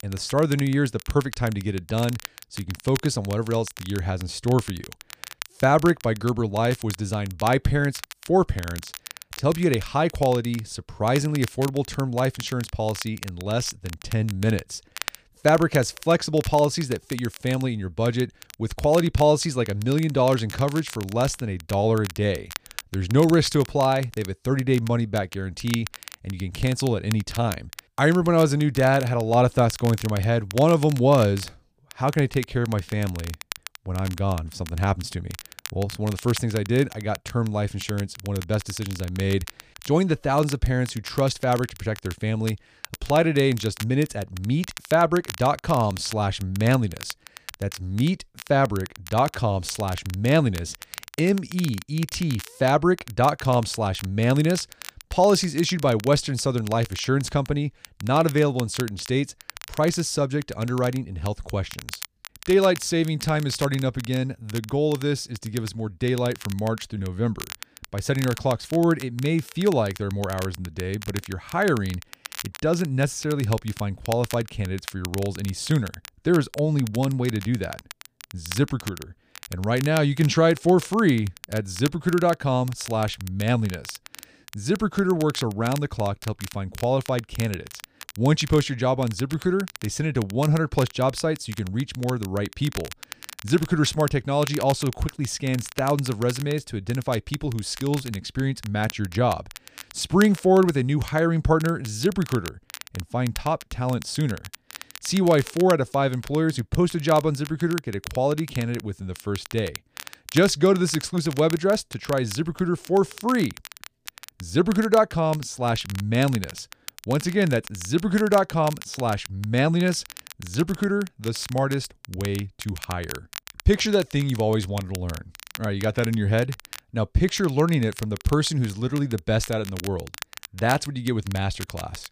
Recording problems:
crackle, like an old record; noticeable; 15 dB below the speech

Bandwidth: 15 kHz